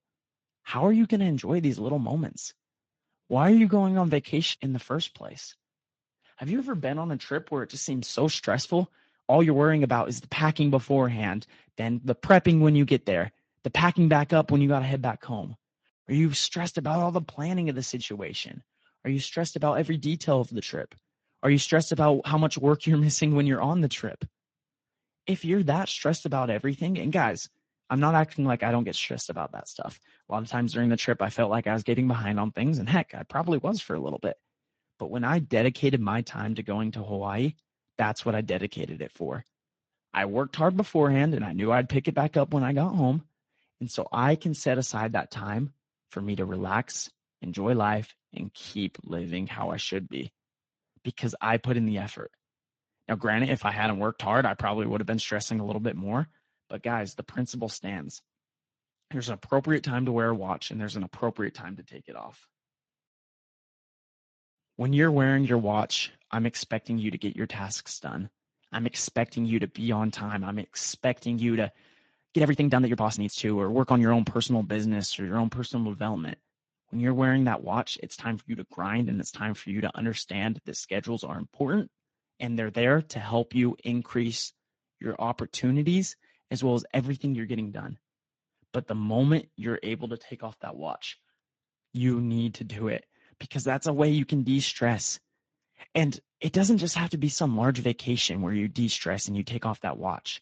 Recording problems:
garbled, watery; slightly; nothing above 7.5 kHz
uneven, jittery; strongly; from 3 s to 1:17

